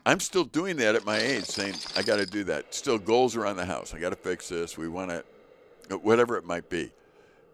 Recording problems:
household noises; loud; throughout; 6 dB below the speech

